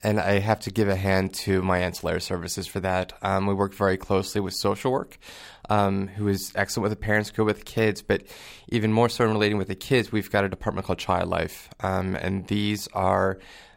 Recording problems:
none

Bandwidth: 16 kHz